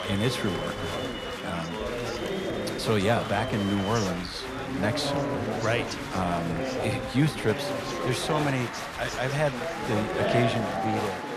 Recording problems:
chatter from many people; loud; throughout; 2 dB below the speech
phone ringing; faint; at 2 s; peak 15 dB below the speech

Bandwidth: 14 kHz